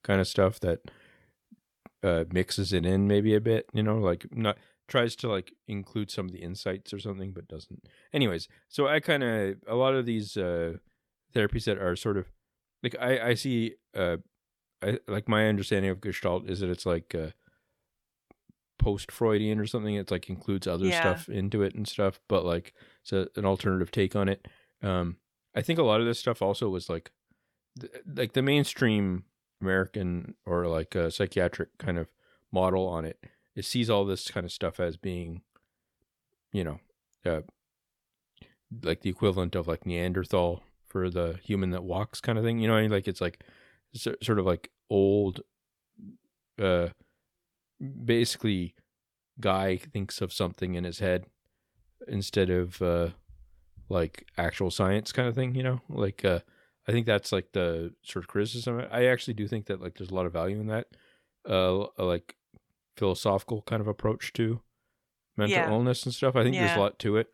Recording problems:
none

